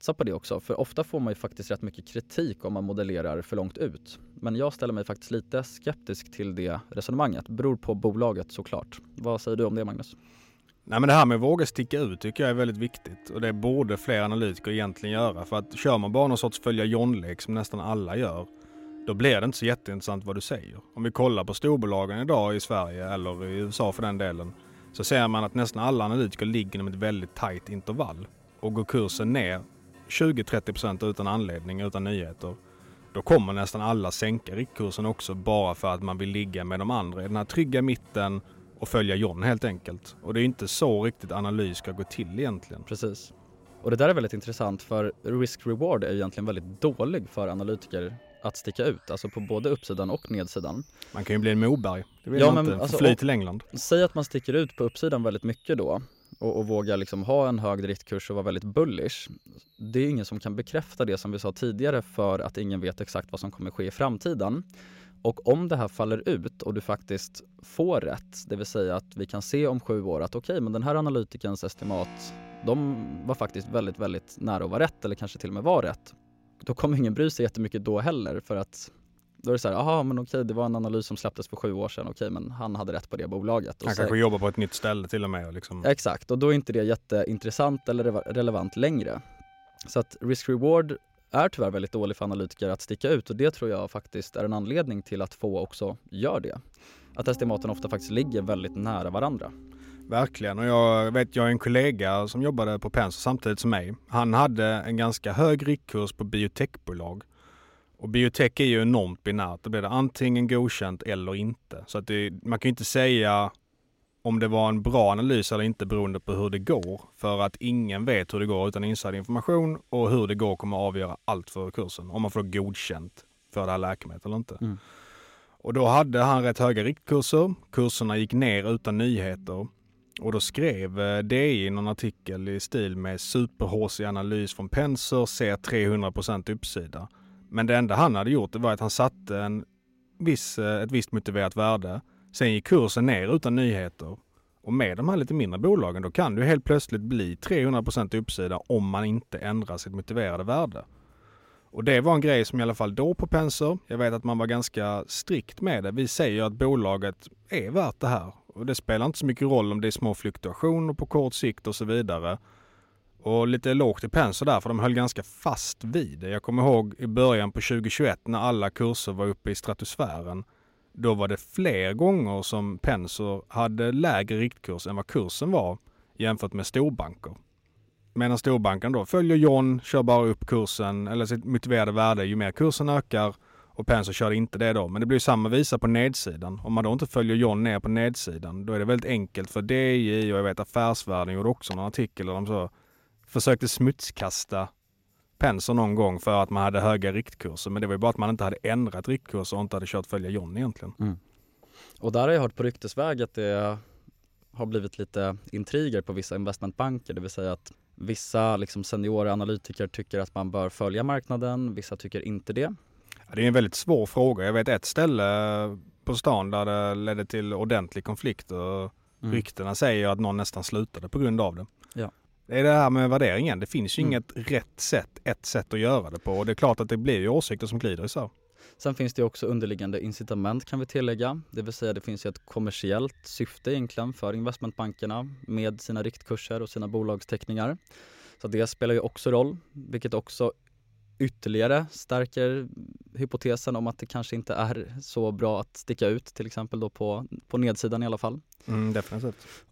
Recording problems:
background music; faint; throughout; 25 dB below the speech

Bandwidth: 16 kHz